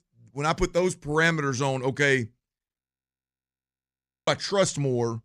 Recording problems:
audio freezing; at 3 s for 1.5 s

